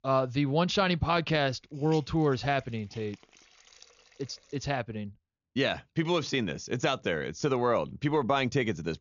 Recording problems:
high frequencies cut off; noticeable; nothing above 7 kHz
hiss; faint; until 4.5 s and from 7 s on; 25 dB below the speech

